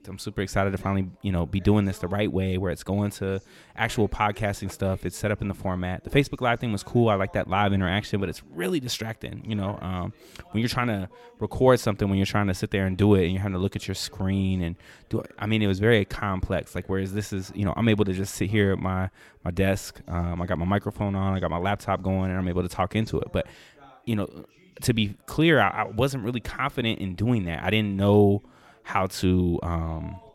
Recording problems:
background chatter; faint; throughout; 2 voices, 30 dB below the speech

